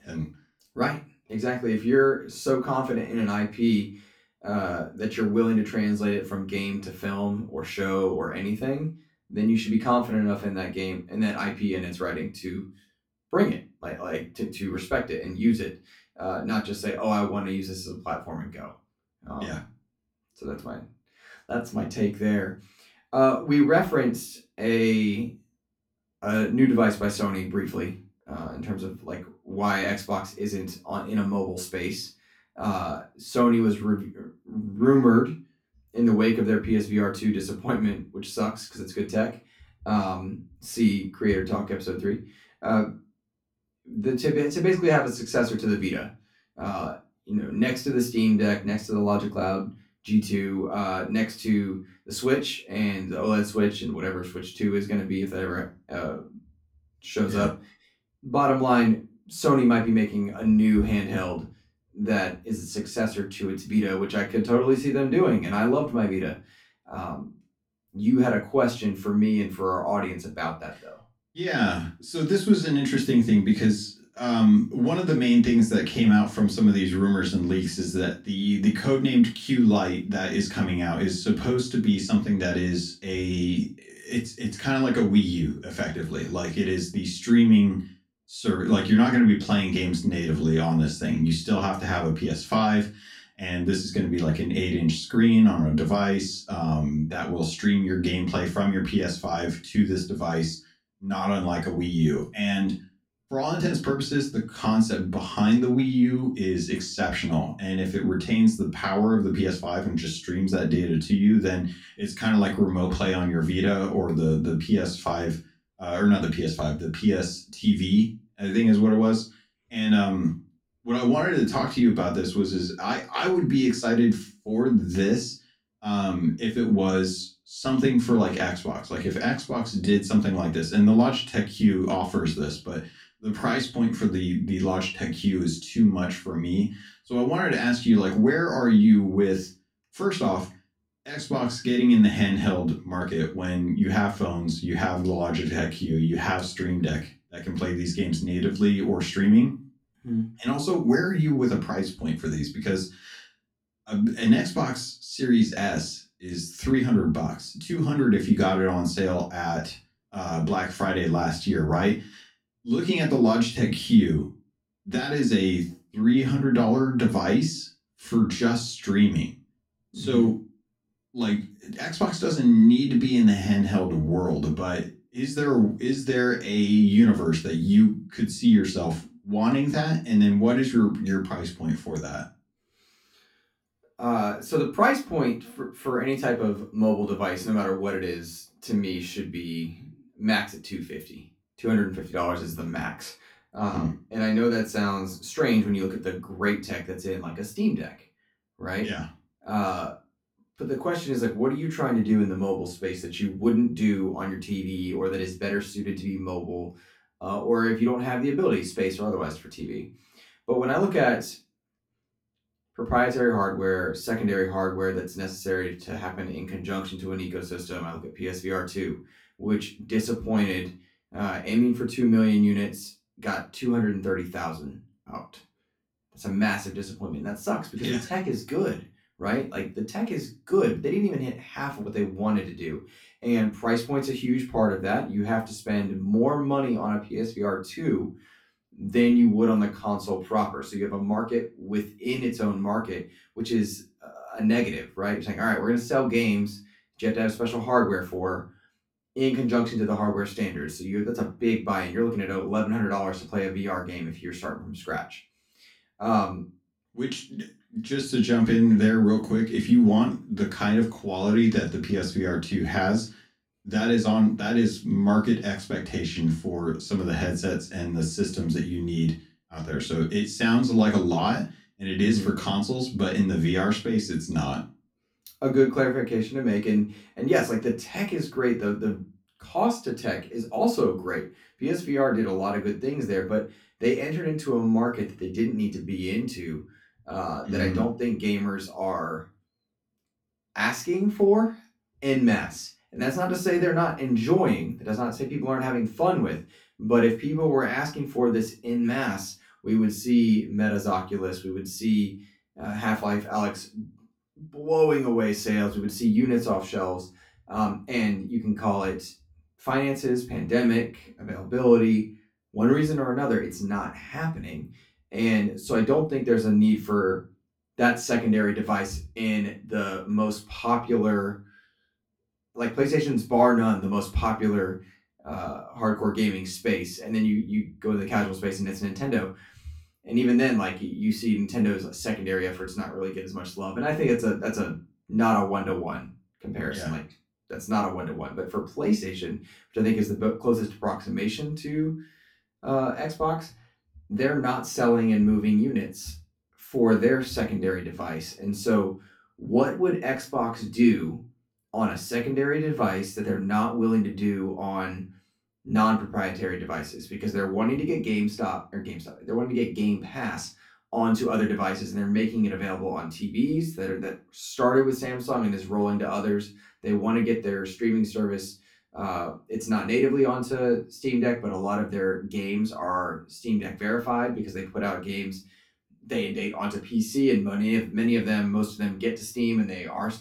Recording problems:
off-mic speech; far
room echo; very slight; dies away in 0.2 s

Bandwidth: 17 kHz